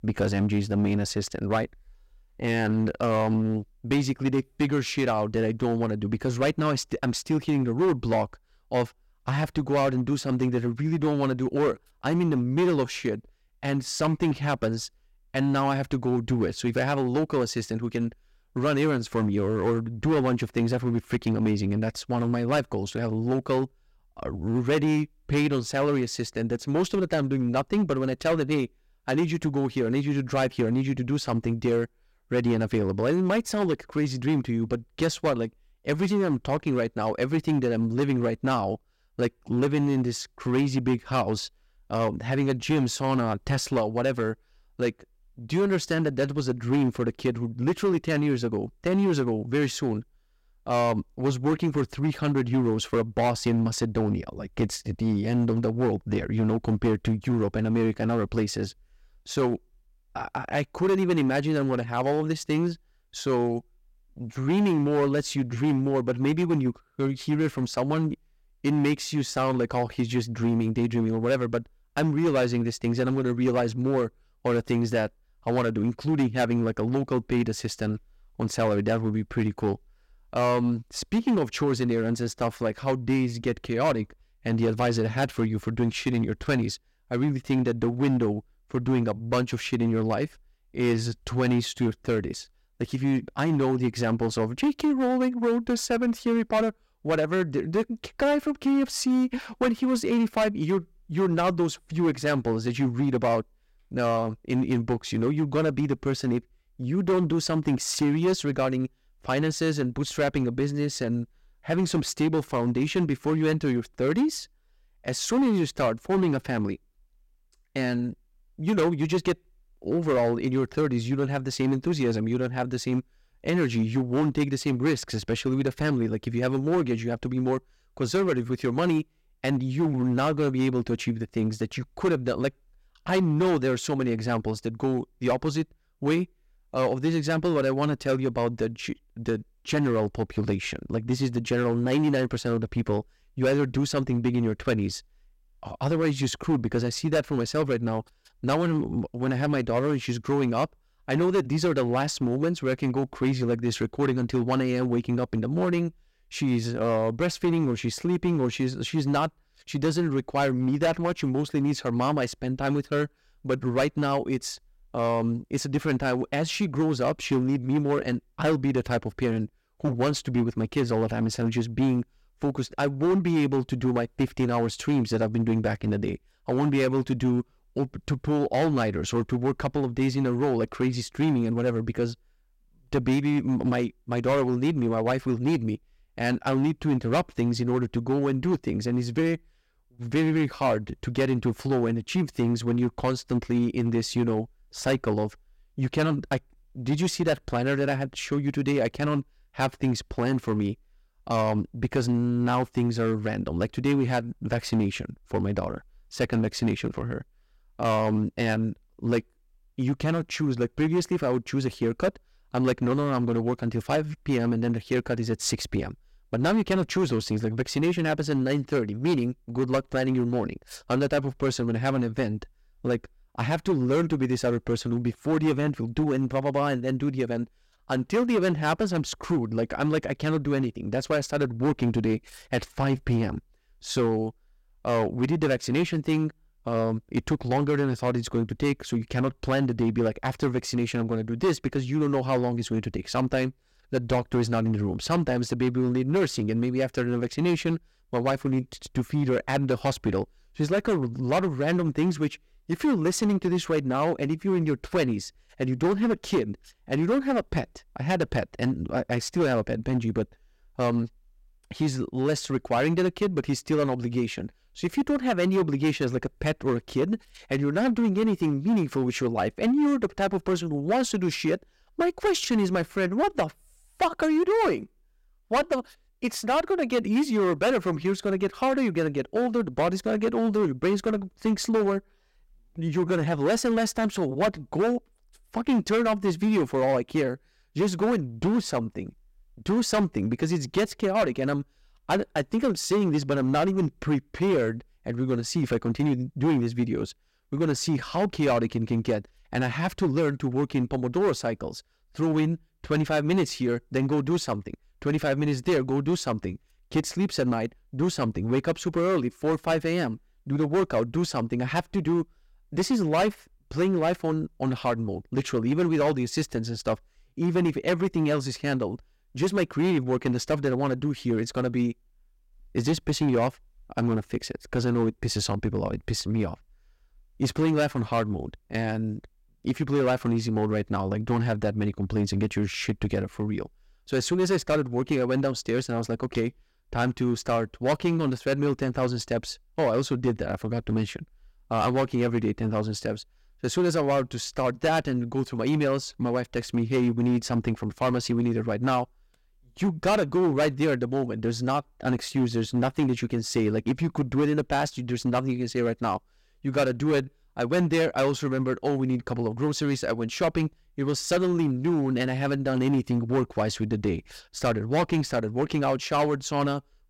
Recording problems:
distortion; slight; 7% of the sound clipped

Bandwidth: 16 kHz